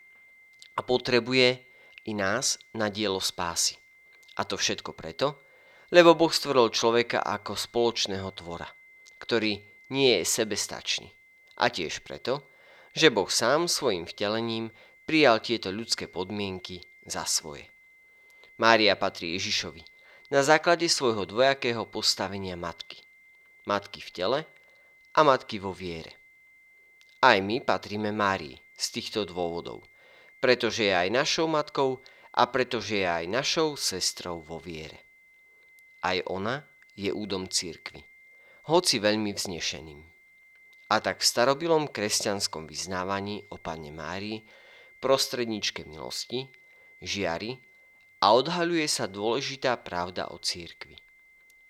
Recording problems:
high-pitched whine; faint; throughout; 2 kHz, 30 dB below the speech

